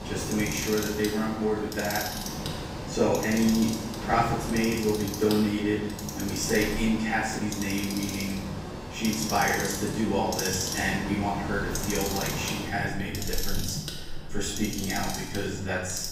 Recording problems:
off-mic speech; far
room echo; noticeable; dies away in 0.7 s
household noises; loud; throughout; 7 dB below the speech
rain or running water; loud; throughout; 9 dB below the speech
chatter from many people; faint; throughout; 25 dB below the speech

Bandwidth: 15.5 kHz